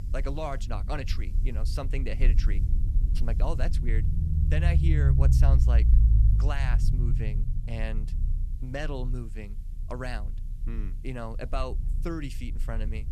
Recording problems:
low rumble; loud; throughout; 5 dB below the speech
hiss; faint; throughout; 30 dB below the speech

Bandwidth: 13.5 kHz